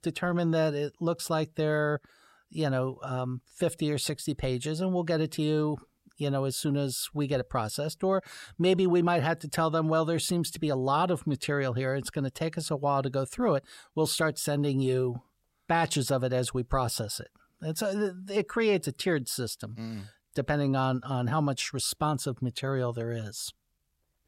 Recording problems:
none

